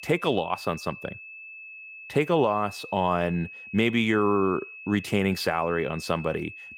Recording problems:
high-pitched whine; noticeable; throughout; 2.5 kHz, 15 dB below the speech

